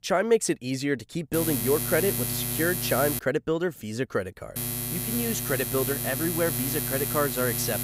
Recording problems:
electrical hum; loud; from 1.5 to 3 s and from 4.5 s on; 60 Hz, 5 dB below the speech

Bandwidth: 15.5 kHz